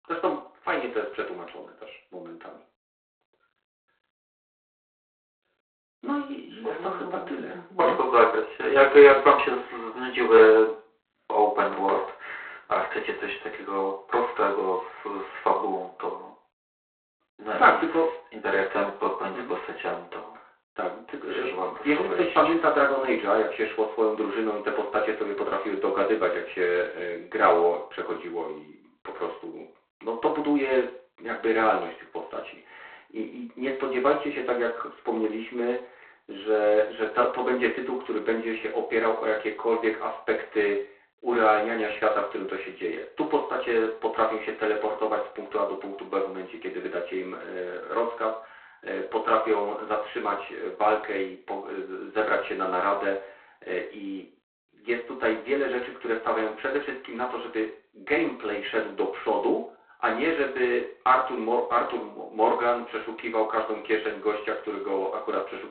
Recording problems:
phone-call audio; poor line; nothing above 4 kHz
off-mic speech; far
room echo; slight; dies away in 0.4 s

